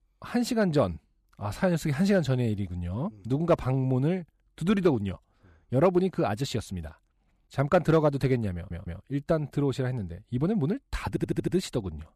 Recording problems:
audio stuttering; at 8.5 s and at 11 s

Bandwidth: 14.5 kHz